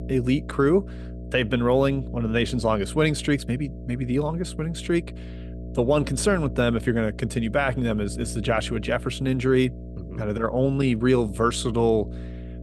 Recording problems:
electrical hum; noticeable; throughout; 60 Hz, 20 dB below the speech

